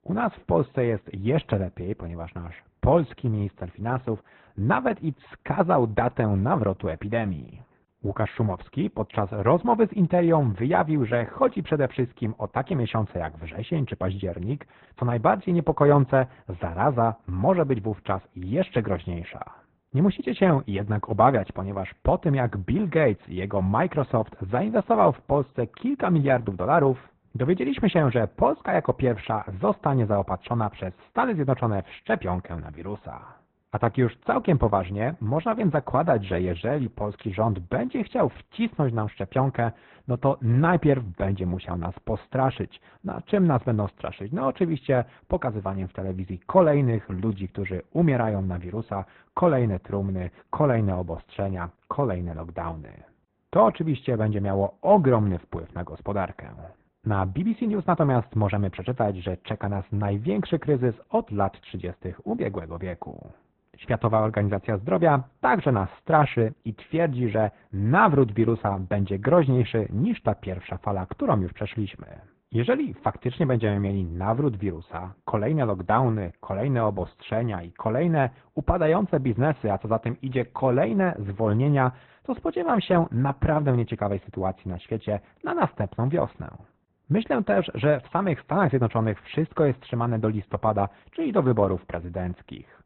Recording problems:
garbled, watery; badly
high frequencies cut off; severe; nothing above 4 kHz
muffled; very slightly; fading above 2 kHz

